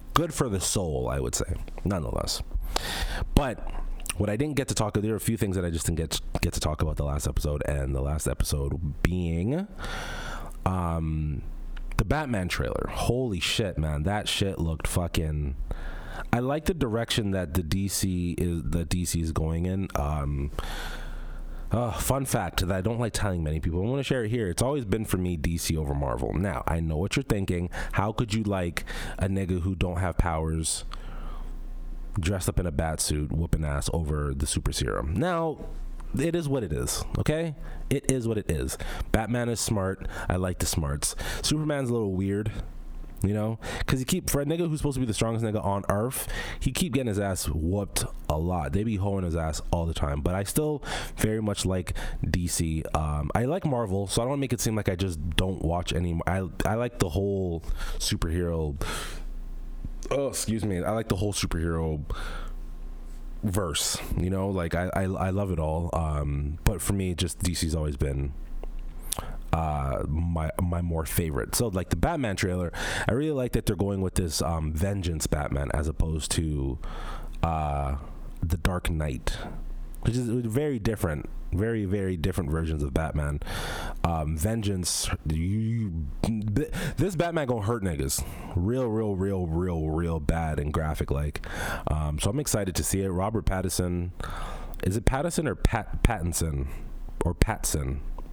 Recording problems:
squashed, flat; heavily

